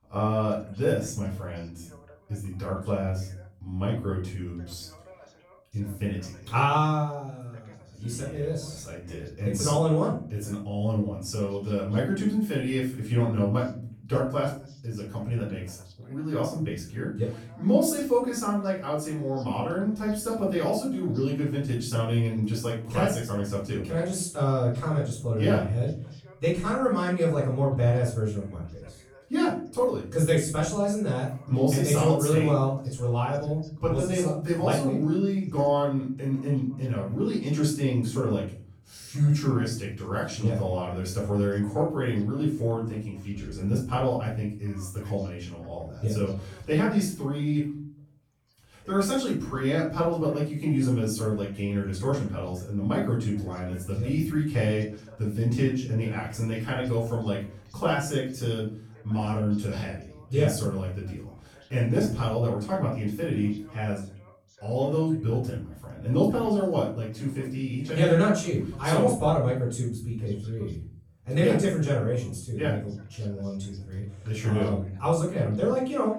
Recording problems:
off-mic speech; far
room echo; noticeable; dies away in 0.5 s
voice in the background; faint; throughout; 30 dB below the speech

